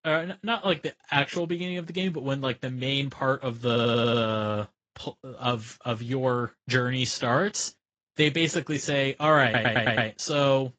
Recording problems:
garbled, watery; slightly; nothing above 7.5 kHz
audio stuttering; at 3.5 s and at 9.5 s

